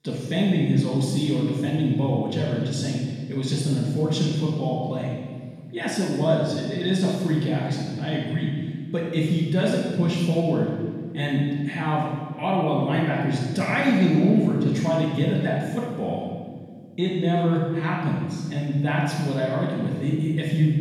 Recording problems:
room echo; strong; dies away in 1.6 s
off-mic speech; far

